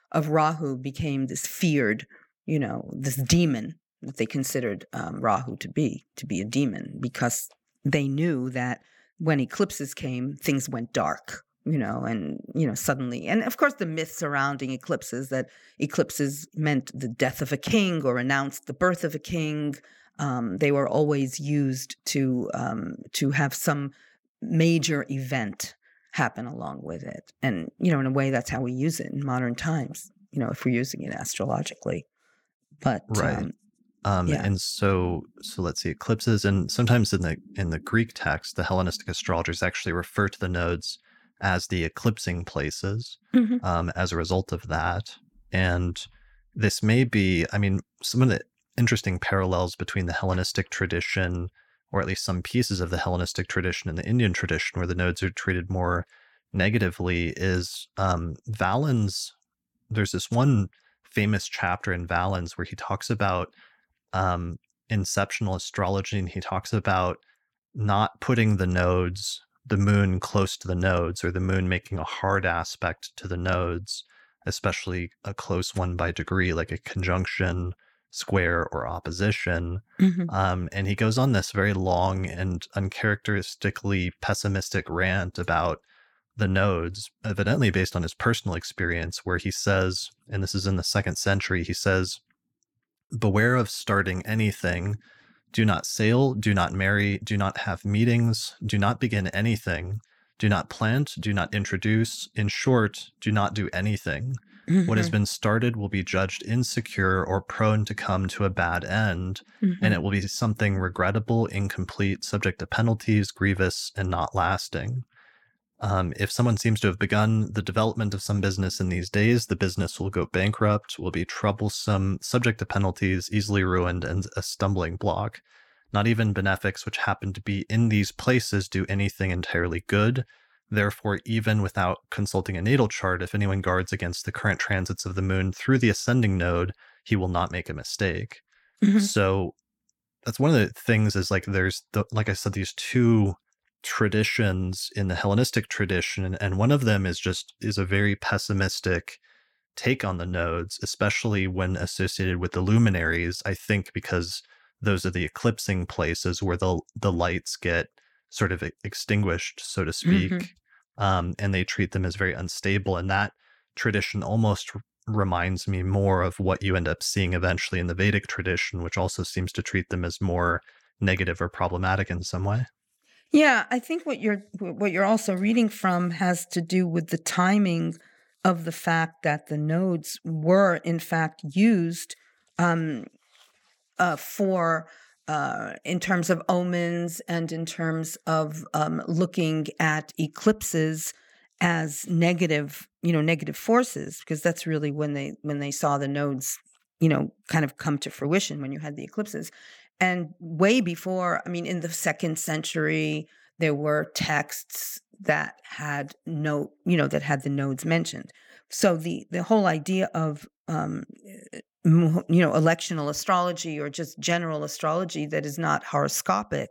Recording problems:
none

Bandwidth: 17 kHz